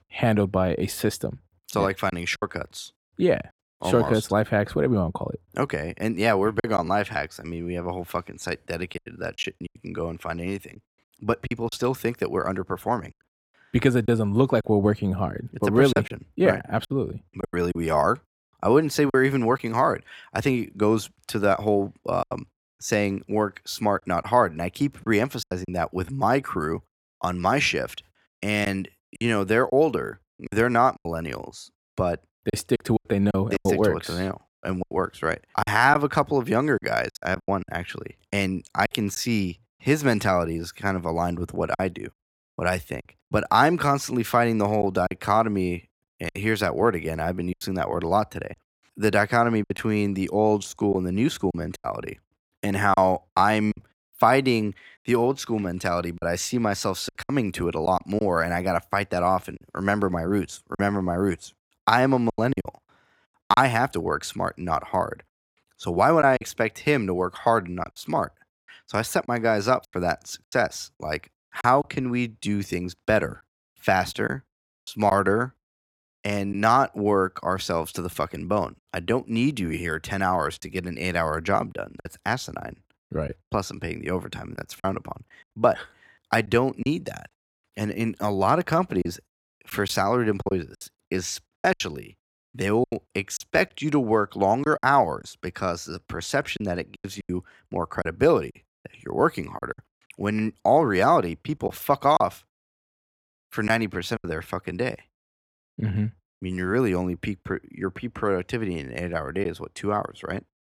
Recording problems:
choppy; very; 5% of the speech affected

